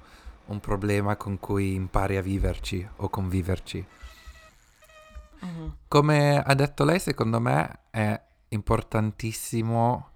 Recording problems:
traffic noise; faint; until 5 s; 30 dB below the speech

